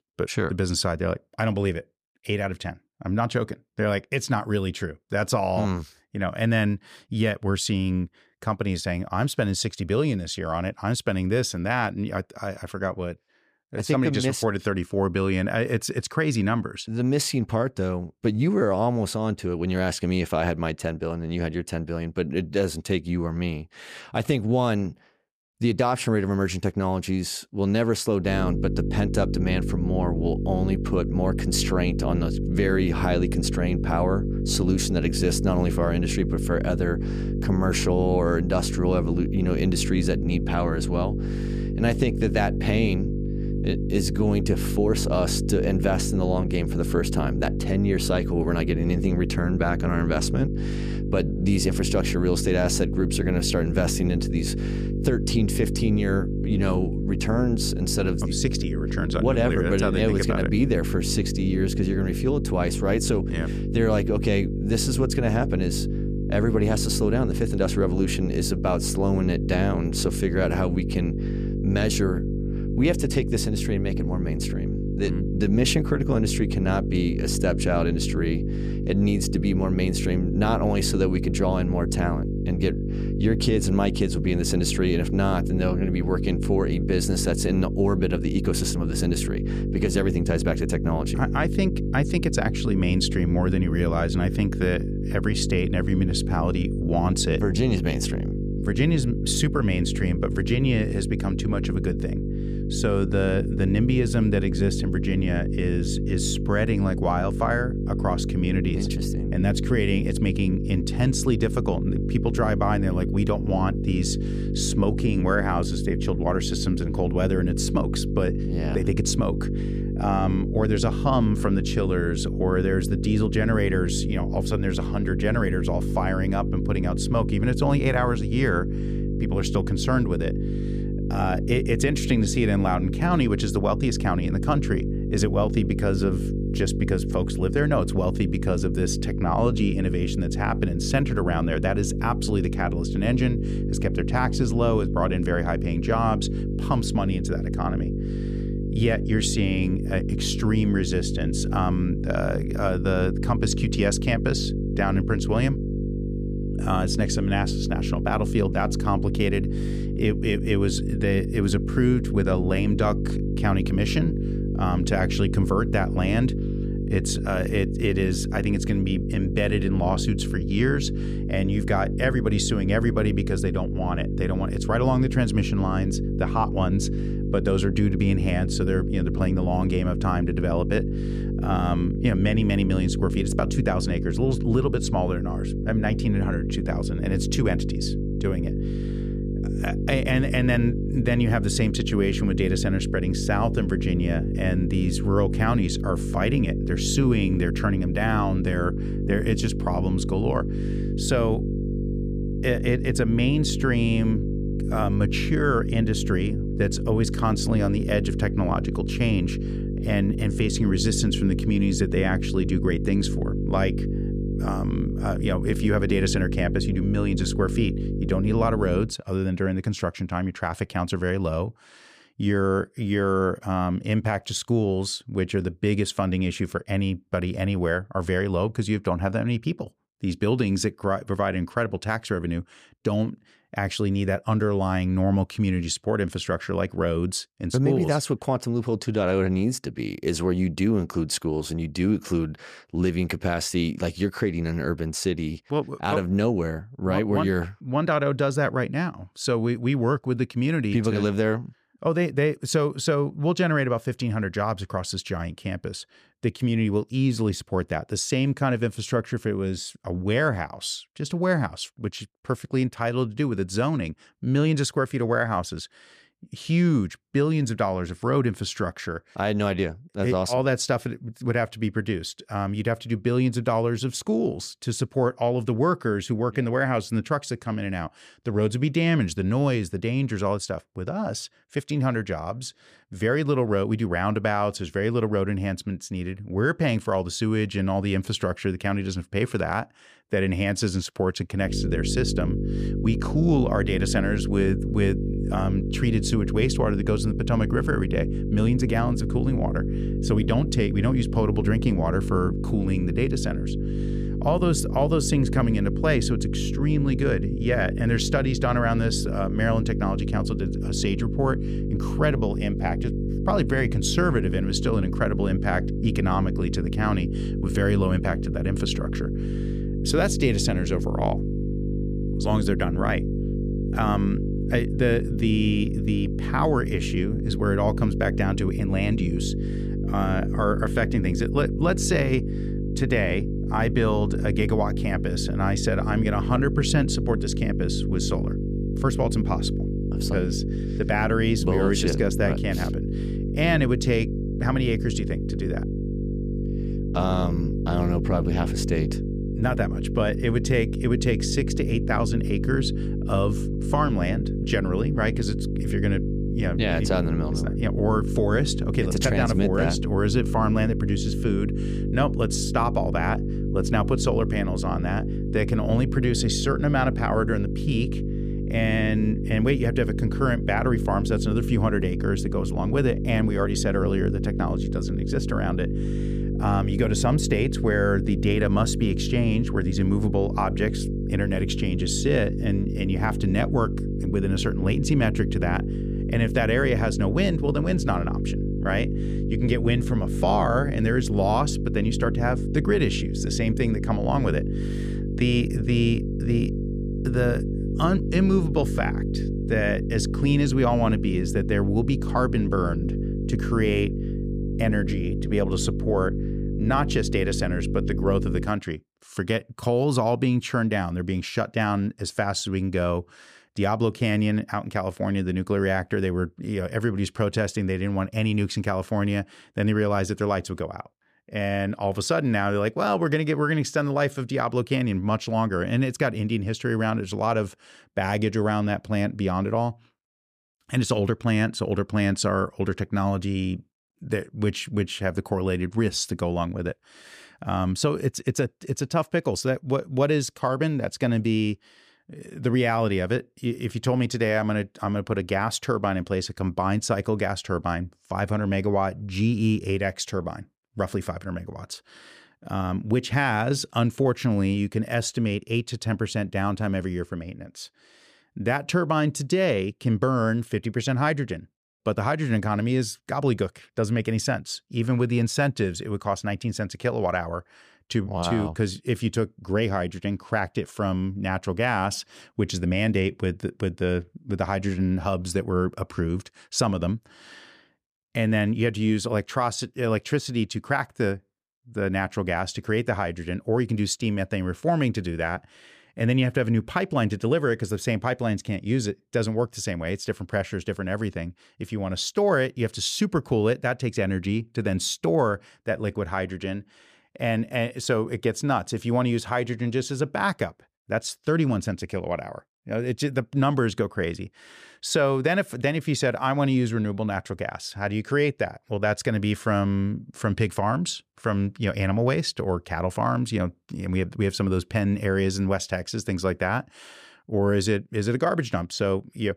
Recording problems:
electrical hum; loud; from 28 s to 3:39 and from 4:51 to 6:48; 50 Hz, 7 dB below the speech

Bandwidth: 14.5 kHz